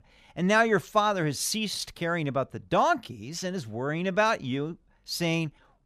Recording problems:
none

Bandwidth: 14.5 kHz